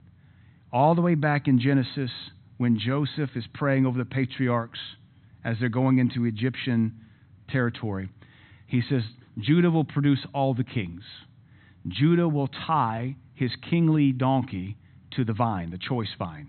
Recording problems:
high frequencies cut off; severe; nothing above 4 kHz

